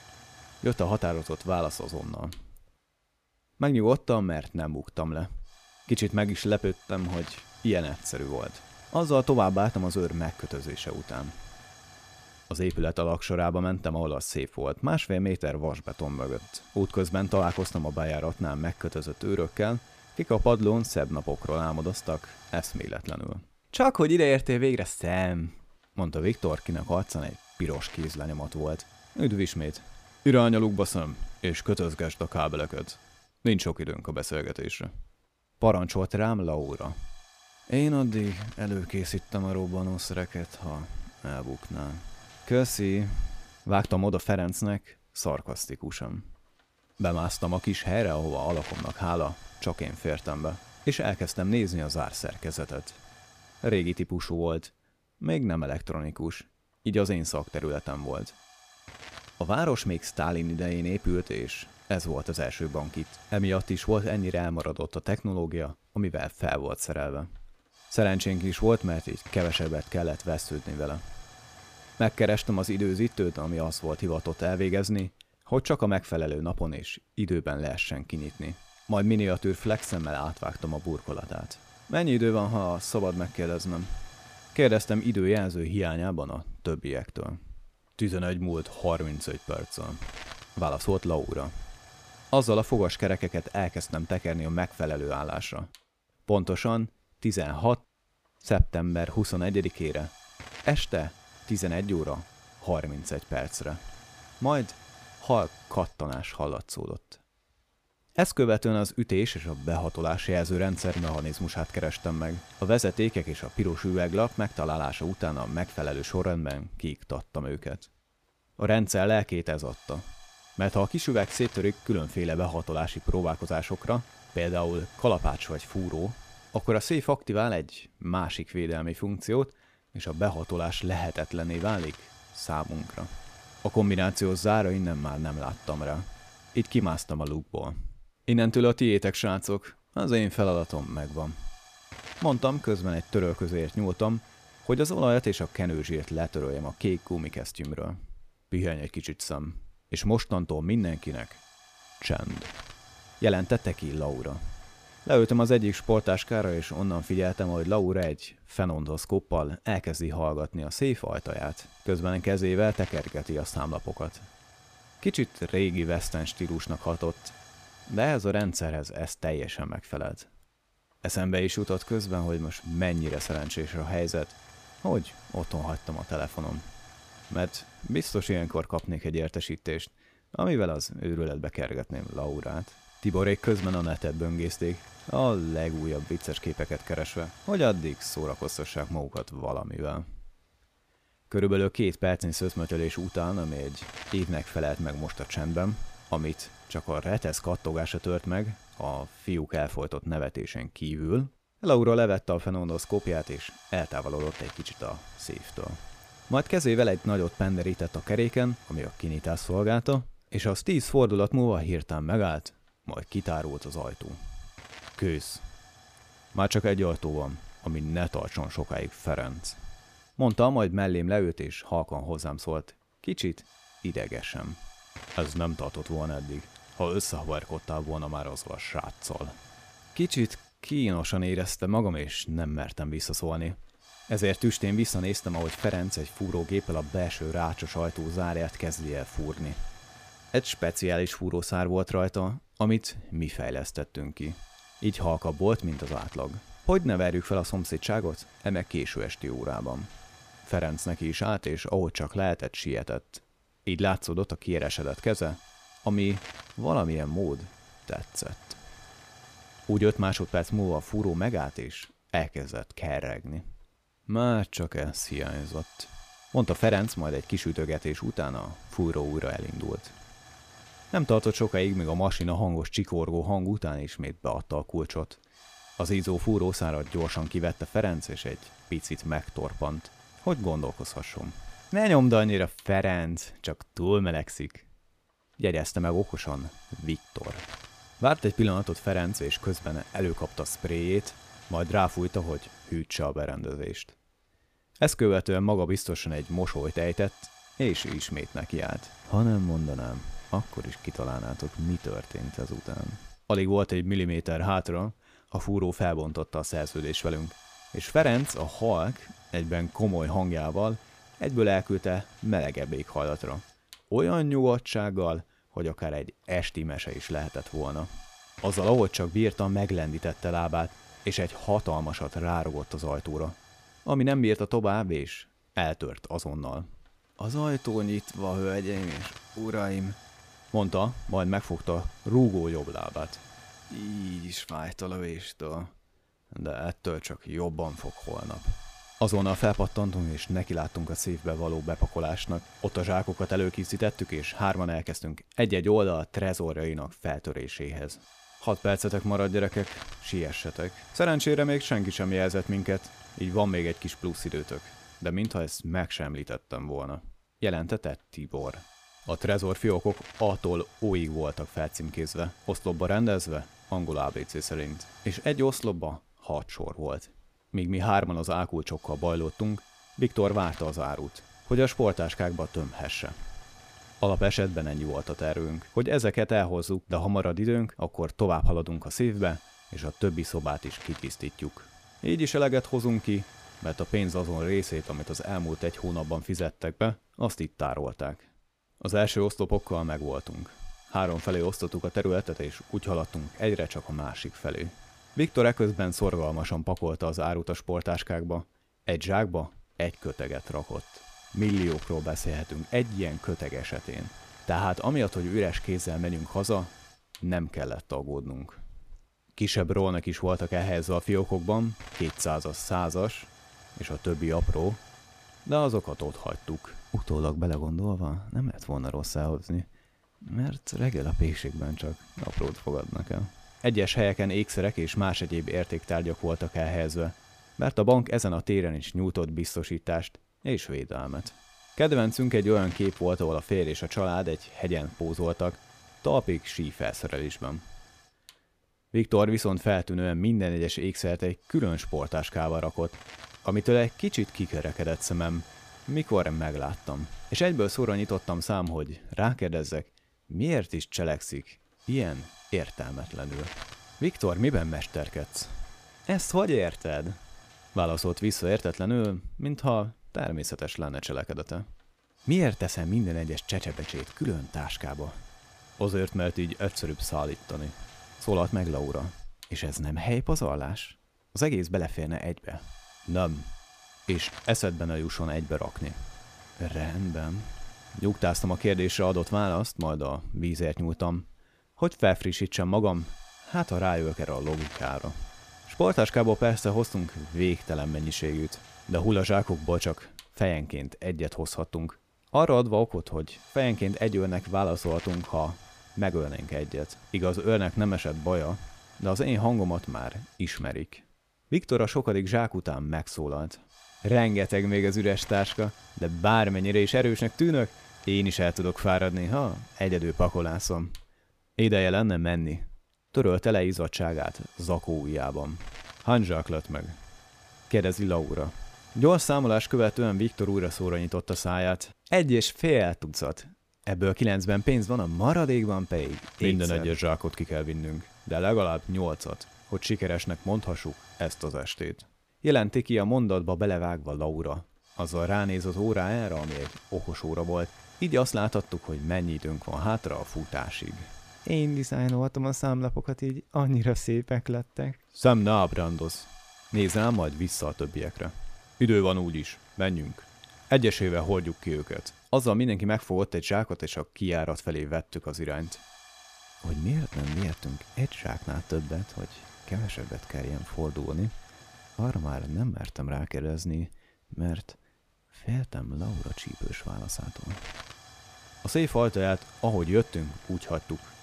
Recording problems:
hiss; faint; throughout; 20 dB below the speech

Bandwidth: 14.5 kHz